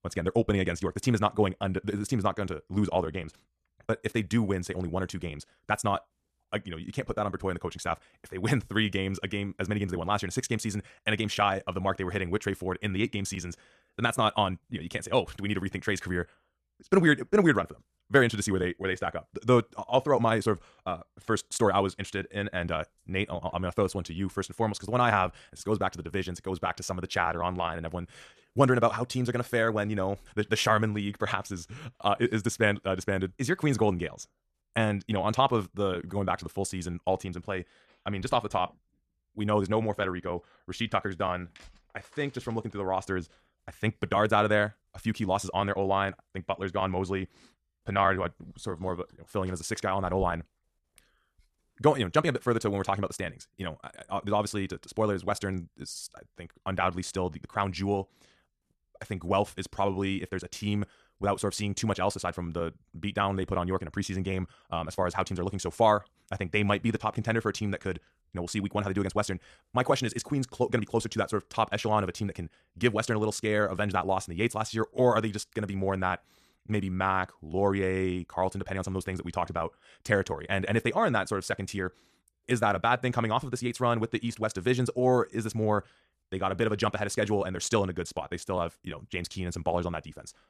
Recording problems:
wrong speed, natural pitch; too fast; 1.6 times normal speed

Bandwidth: 14 kHz